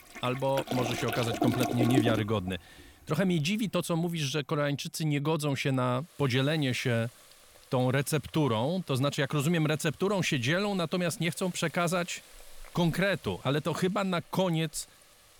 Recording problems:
household noises; loud; throughout; 4 dB below the speech

